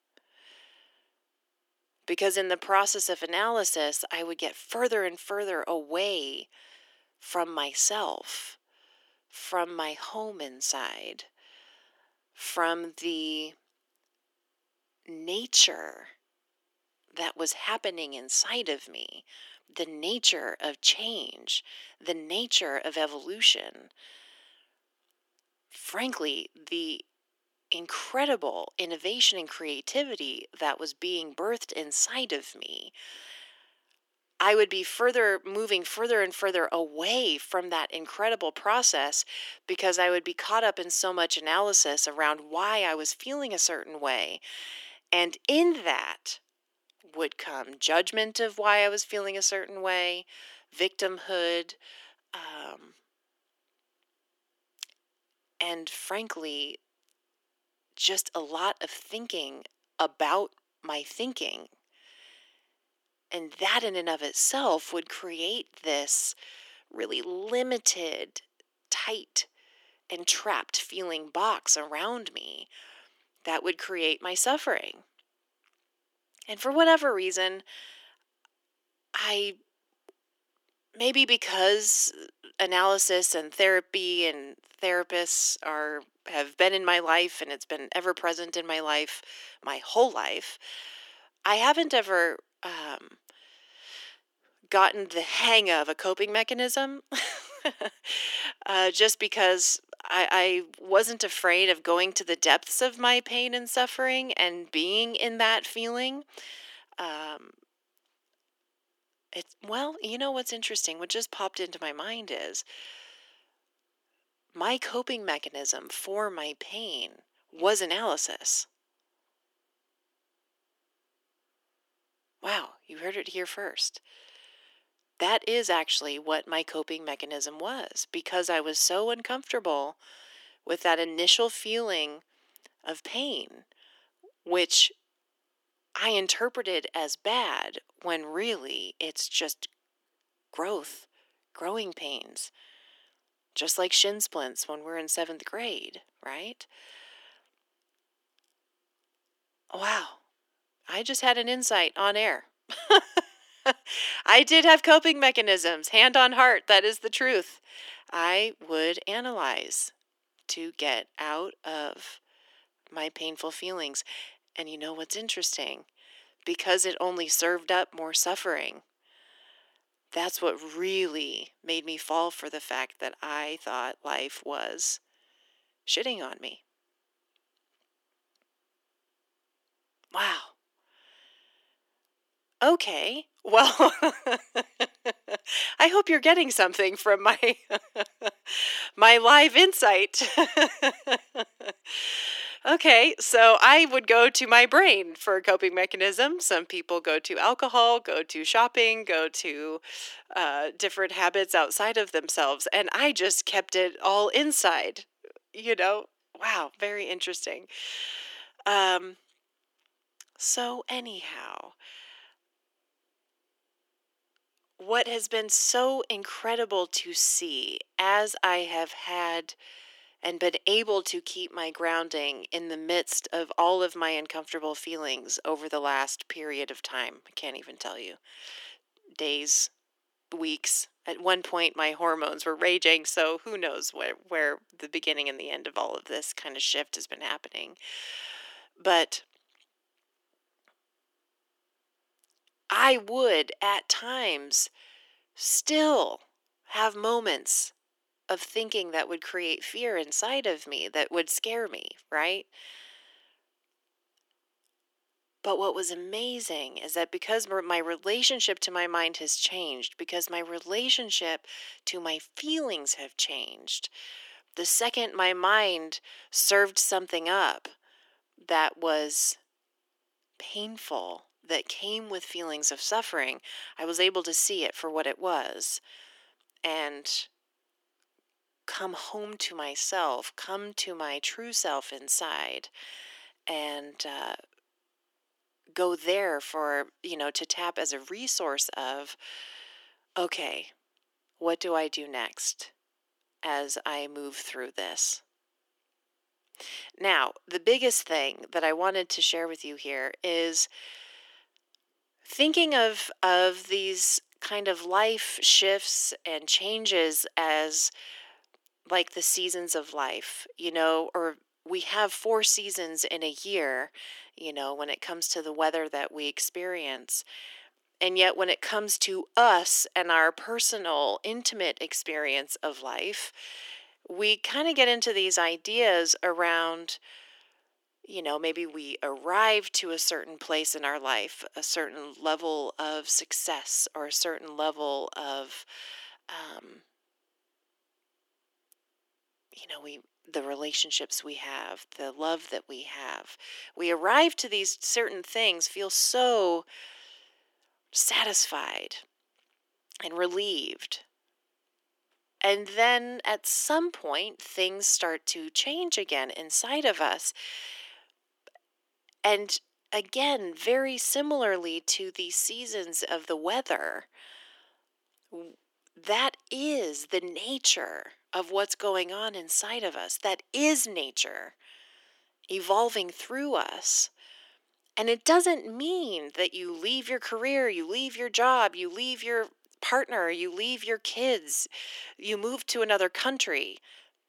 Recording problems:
thin; very; fading below 300 Hz

